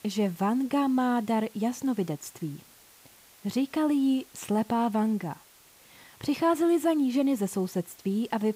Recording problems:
hiss; faint; throughout; 25 dB below the speech

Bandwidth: 15.5 kHz